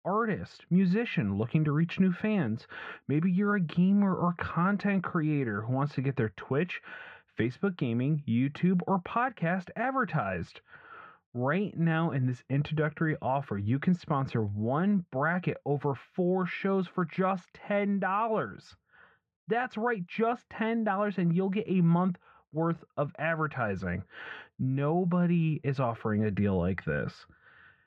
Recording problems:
muffled; very; fading above 2 kHz

